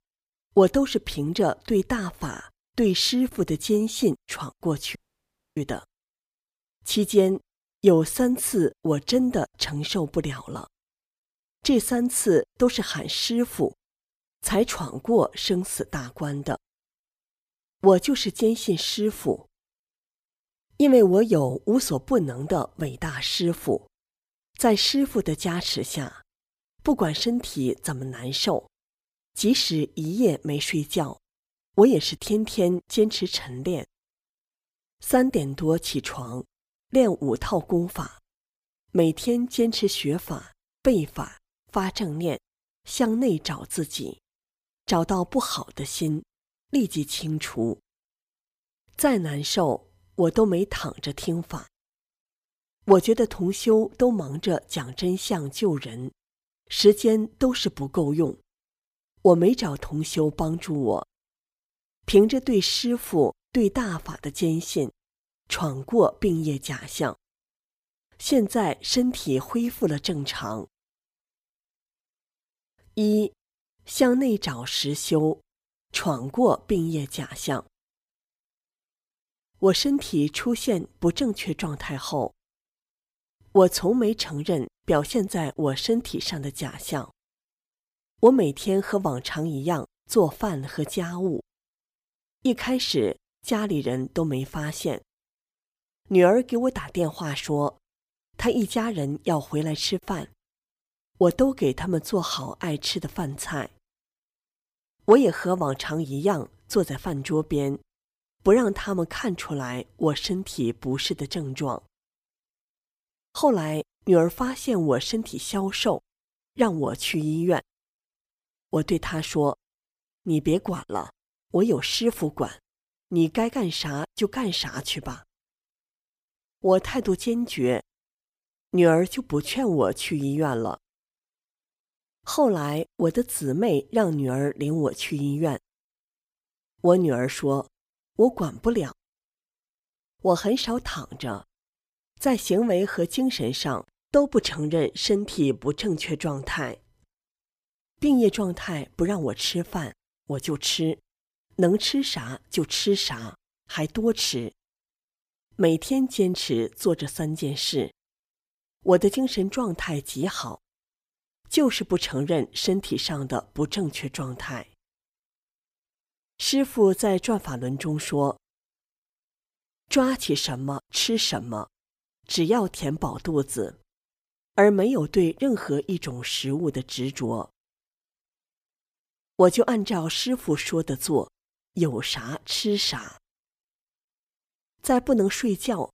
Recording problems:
audio cutting out; at 5 s for 0.5 s

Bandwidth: 15 kHz